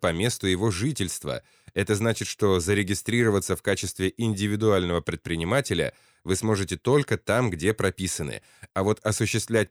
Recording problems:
none

